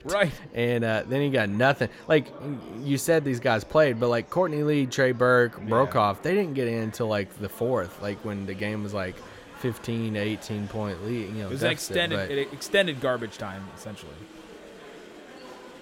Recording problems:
murmuring crowd; noticeable; throughout; 20 dB below the speech

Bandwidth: 16 kHz